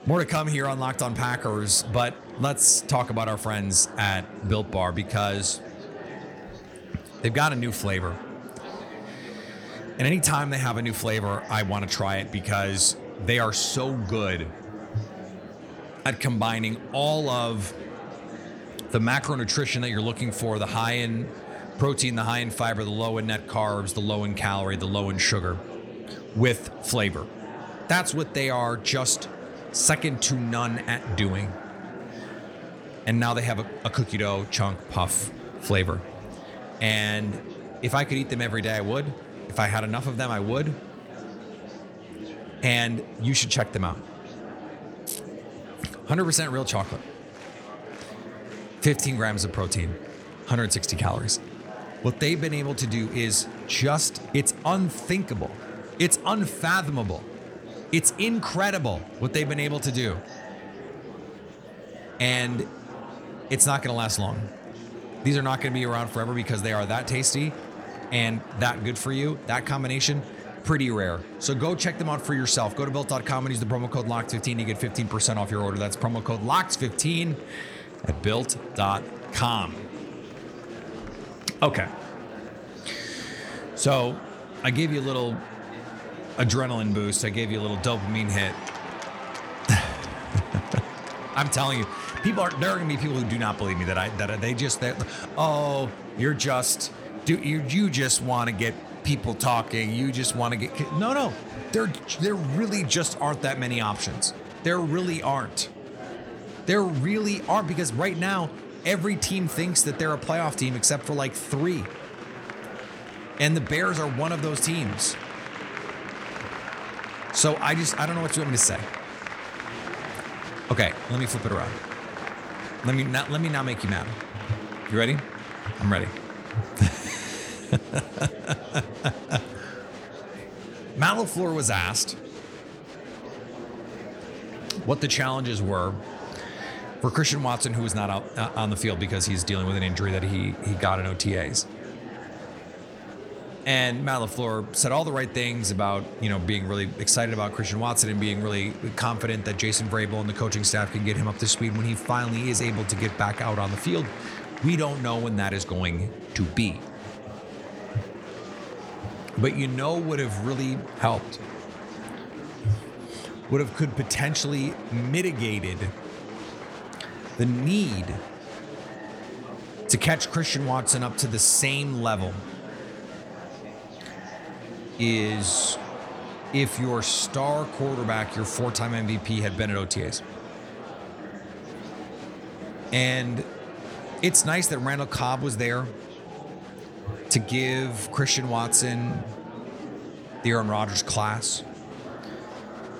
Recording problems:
murmuring crowd; noticeable; throughout; 15 dB below the speech

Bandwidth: 18 kHz